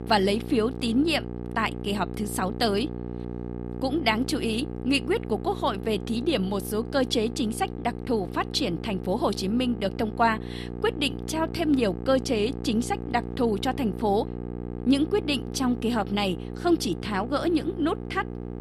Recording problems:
electrical hum; noticeable; throughout; 60 Hz, 15 dB below the speech

